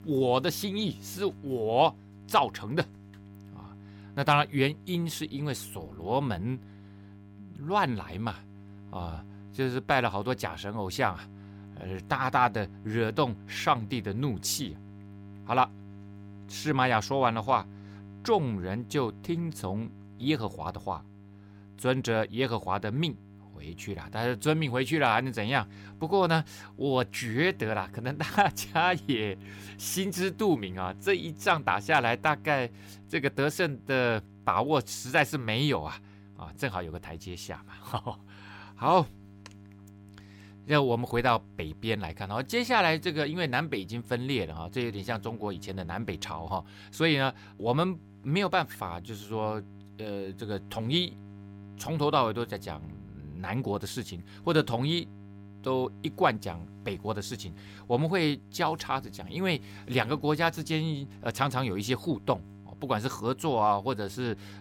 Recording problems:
electrical hum; faint; throughout; 50 Hz, 25 dB below the speech

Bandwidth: 17 kHz